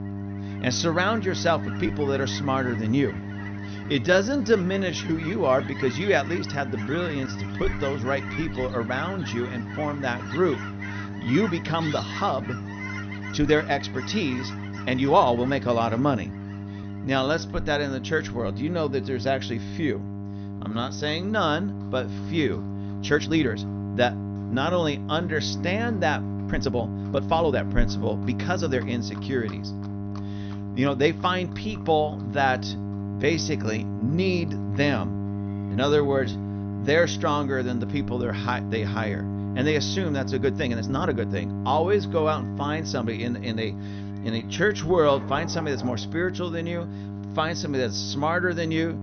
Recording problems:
high frequencies cut off; noticeable; nothing above 6 kHz
electrical hum; noticeable; throughout; 50 Hz, 15 dB below the speech
animal sounds; noticeable; throughout; 15 dB below the speech
uneven, jittery; strongly; from 4 to 48 s

